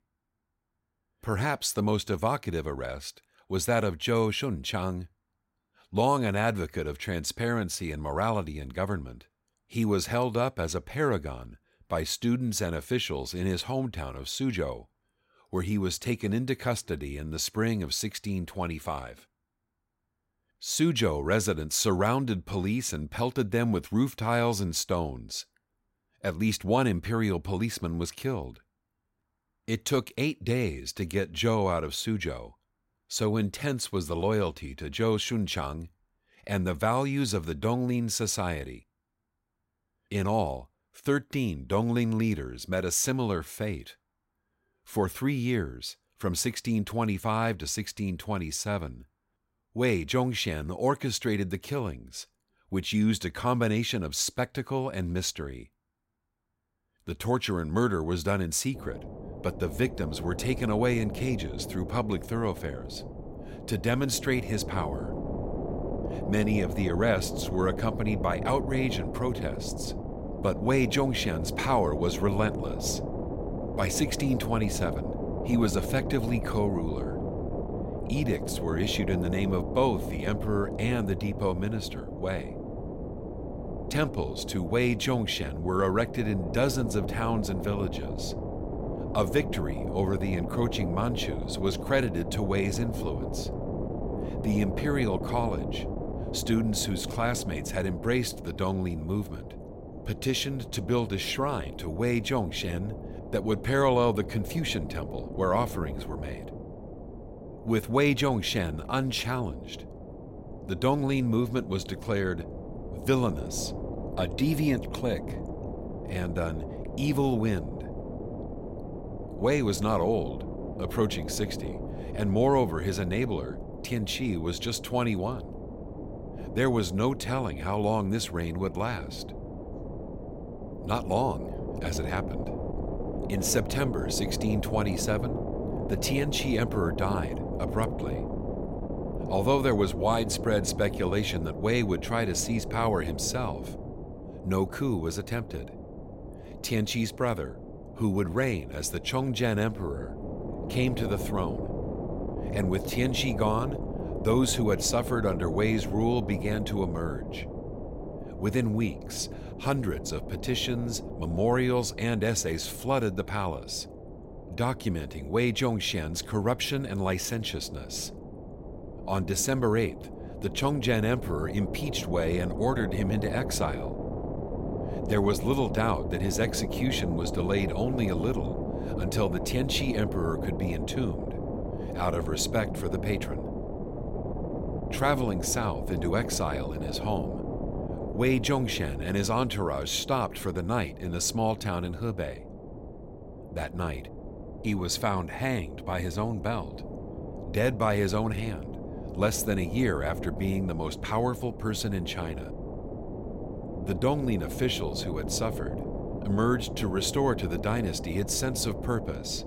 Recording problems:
wind noise on the microphone; heavy; from 59 s on; 9 dB below the speech

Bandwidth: 16 kHz